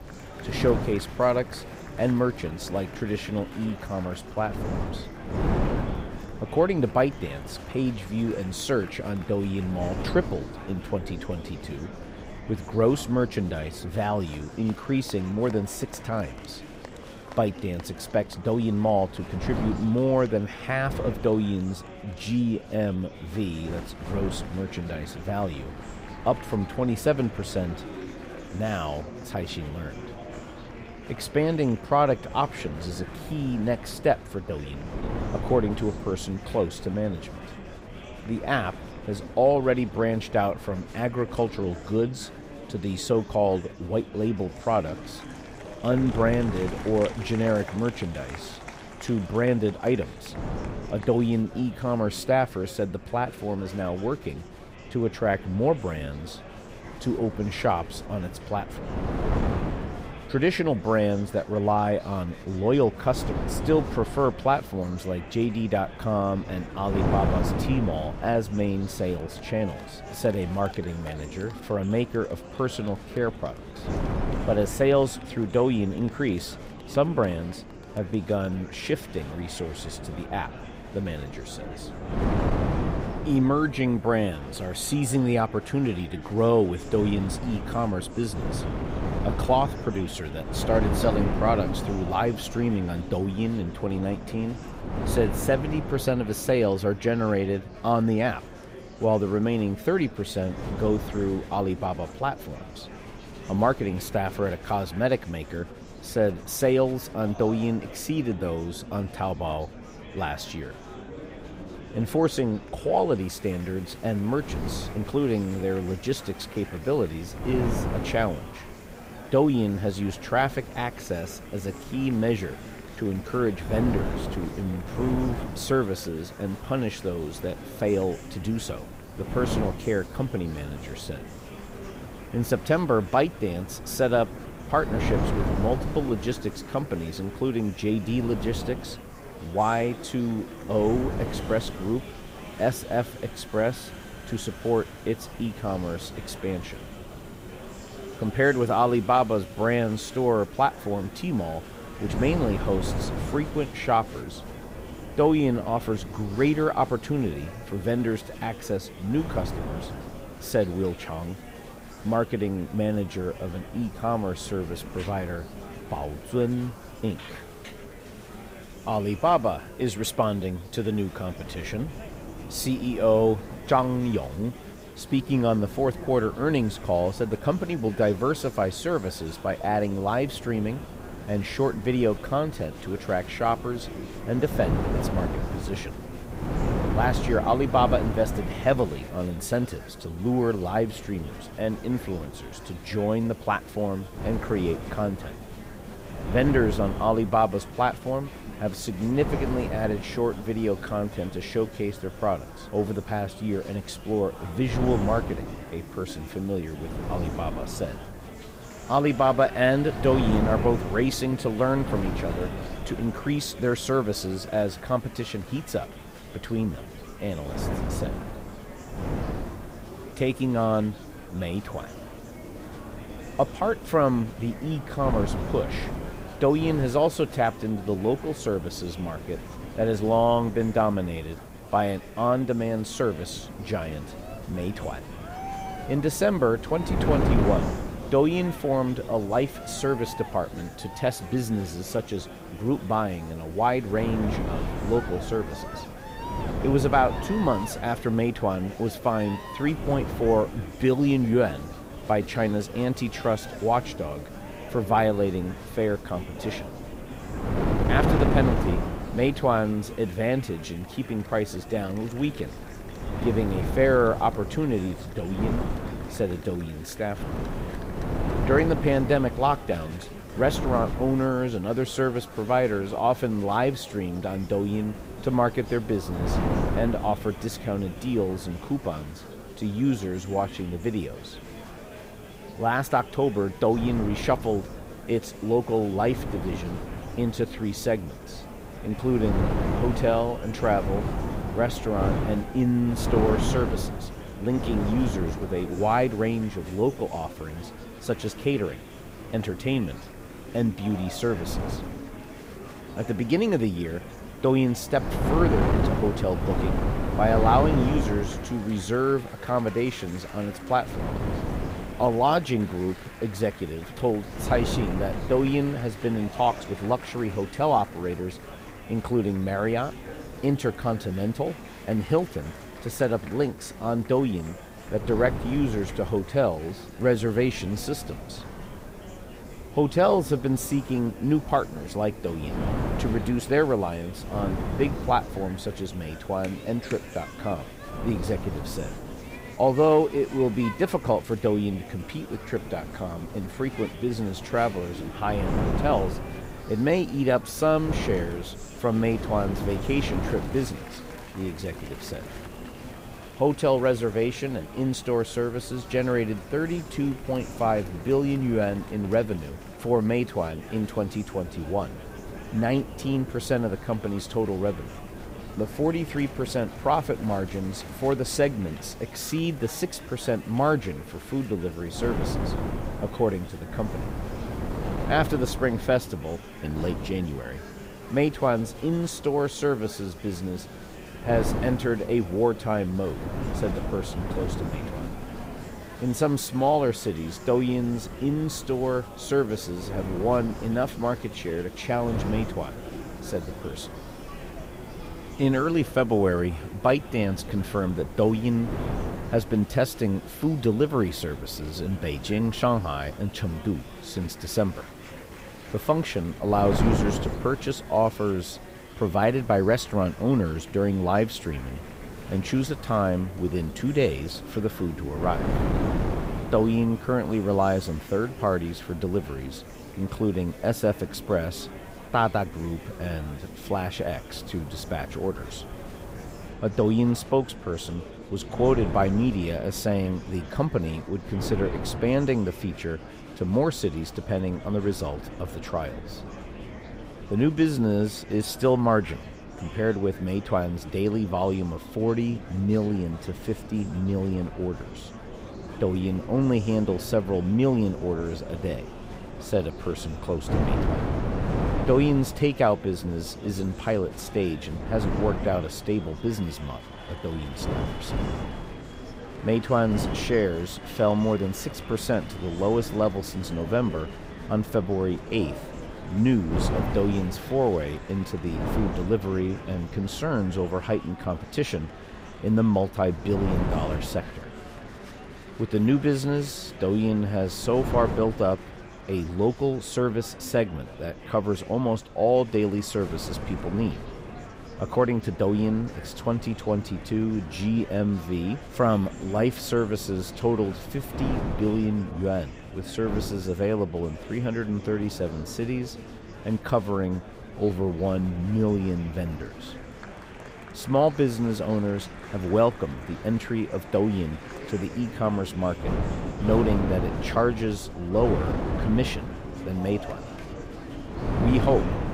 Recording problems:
murmuring crowd; noticeable; throughout; 15 dB below the speech
wind noise on the microphone; occasional gusts; 10 dB below the speech
hiss; faint; from 1:53 to 7:06; 30 dB below the speech

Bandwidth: 15.5 kHz